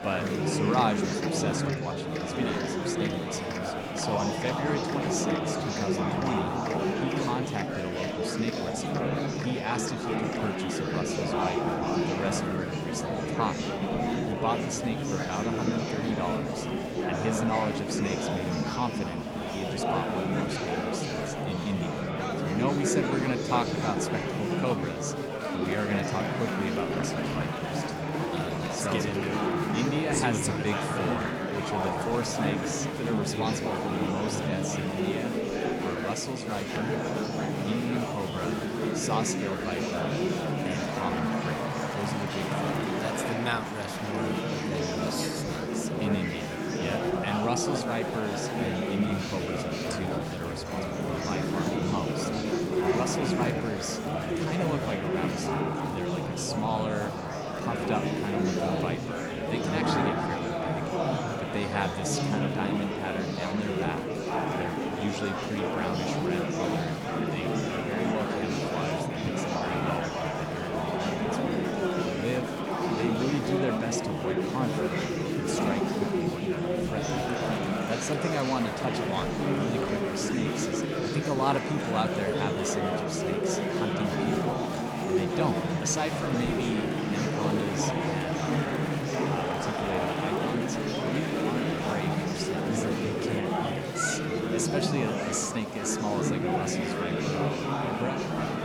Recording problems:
murmuring crowd; very loud; throughout; 4 dB above the speech

